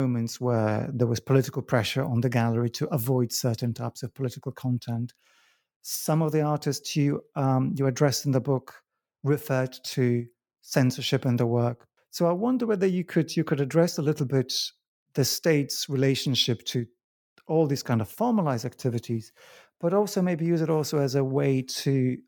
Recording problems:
abrupt cut into speech; at the start

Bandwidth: 18 kHz